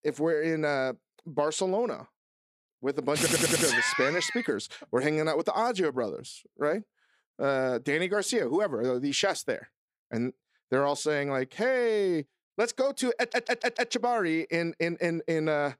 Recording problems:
audio stuttering; at 3 s and at 13 s

